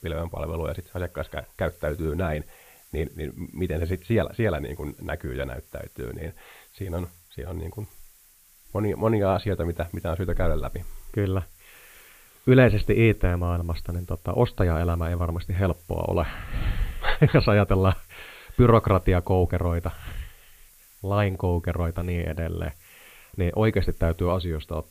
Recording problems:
high frequencies cut off; severe; nothing above 4.5 kHz
hiss; faint; throughout; 25 dB below the speech

